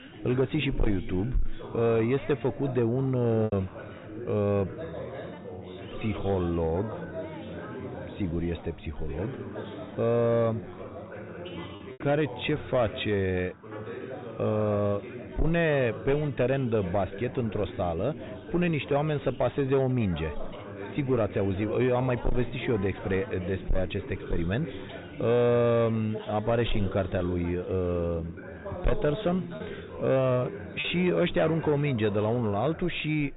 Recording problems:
high frequencies cut off; severe; nothing above 4 kHz
distortion; slight; 10 dB below the speech
background chatter; noticeable; throughout; 4 voices, 10 dB below the speech
choppy; occasionally; at 3.5 s and at 31 s; 3% of the speech affected

